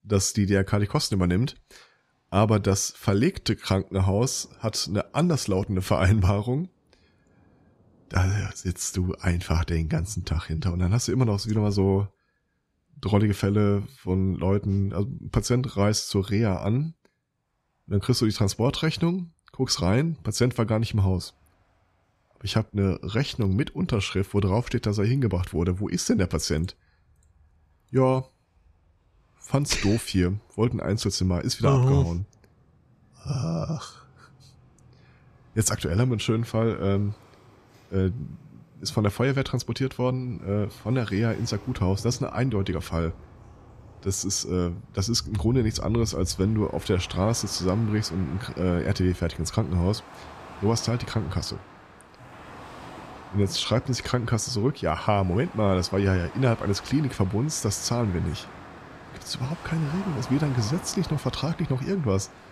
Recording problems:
rain or running water; noticeable; throughout; 20 dB below the speech

